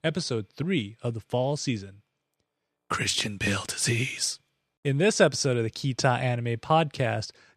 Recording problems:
none

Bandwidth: 14 kHz